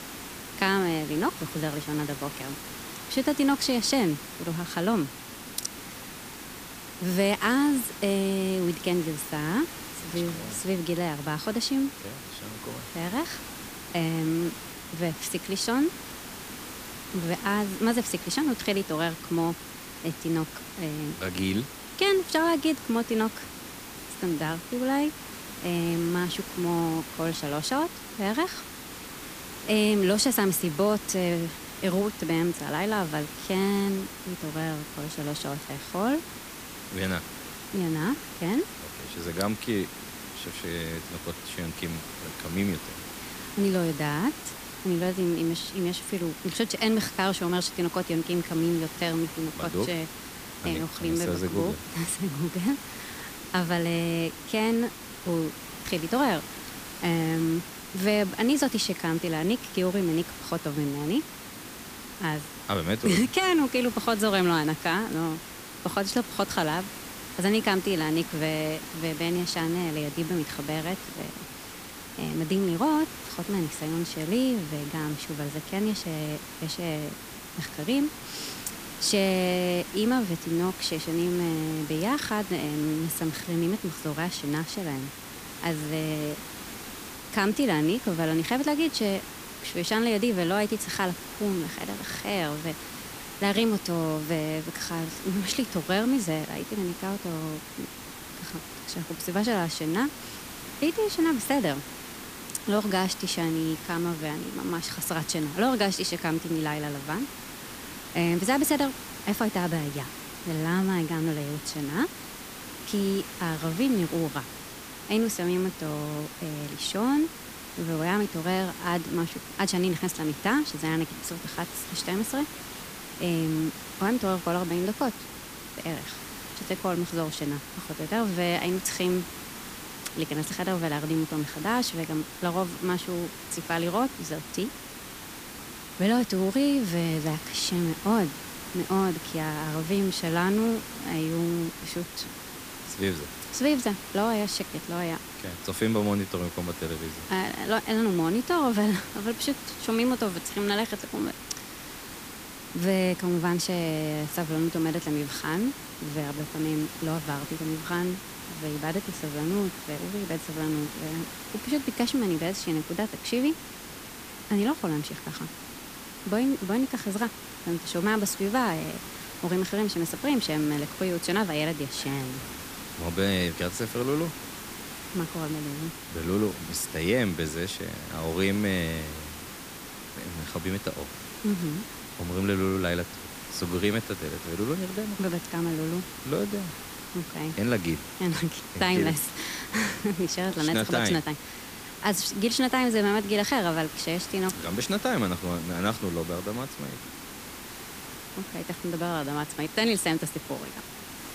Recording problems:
hiss; noticeable; throughout; 10 dB below the speech

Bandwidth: 15 kHz